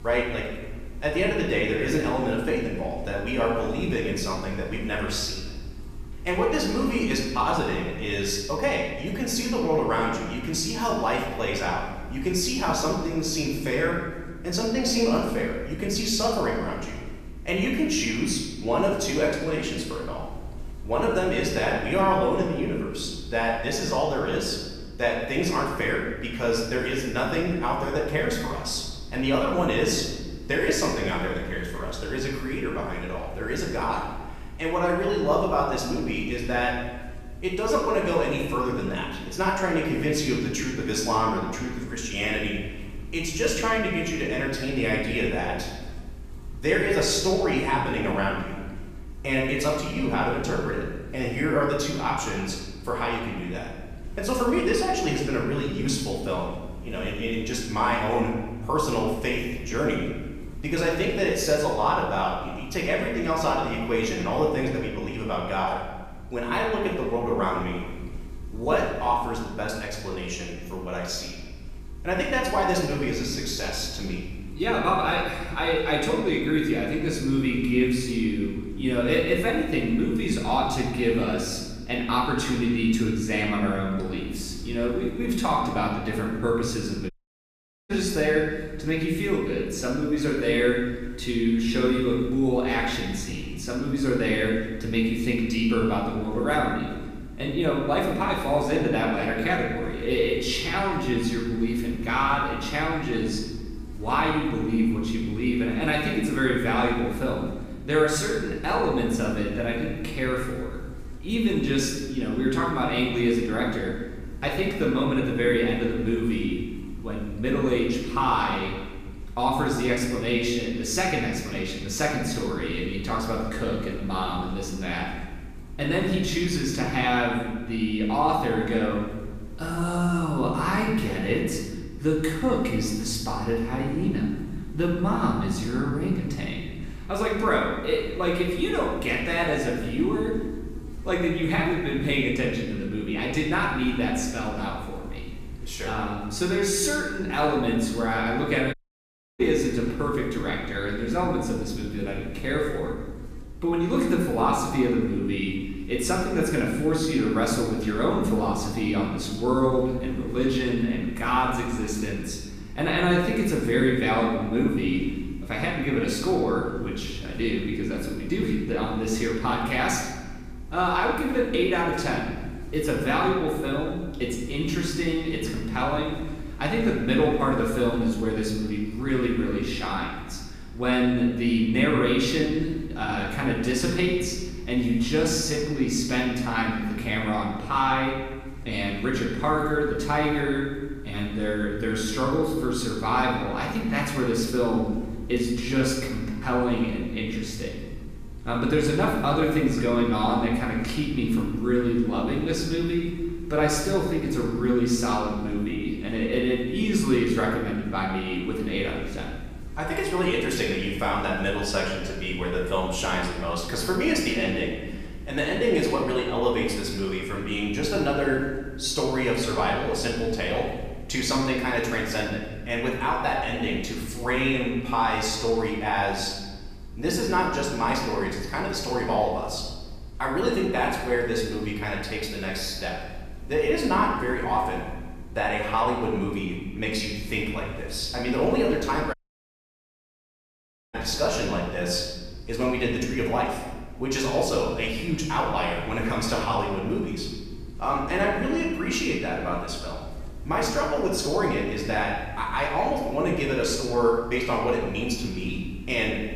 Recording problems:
off-mic speech; far
room echo; noticeable; dies away in 1.3 s
electrical hum; faint; throughout; 50 Hz, 25 dB below the speech
audio cutting out; at 1:27 for 1 s, at 2:29 for 0.5 s and at 3:59 for 2 s

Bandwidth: 14.5 kHz